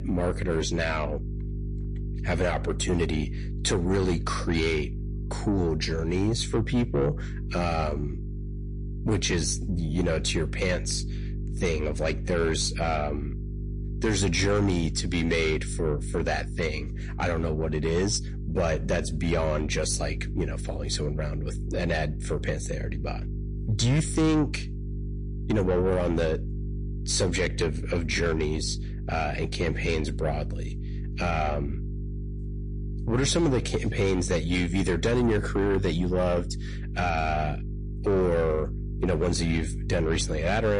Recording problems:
distortion; slight; 10 dB below the speech
garbled, watery; slightly
electrical hum; noticeable; throughout; 50 Hz, 15 dB below the speech
abrupt cut into speech; at the end

